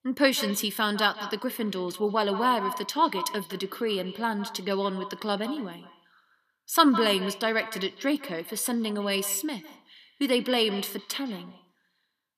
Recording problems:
echo of what is said; noticeable; throughout; 160 ms later, 10 dB below the speech

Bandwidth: 14.5 kHz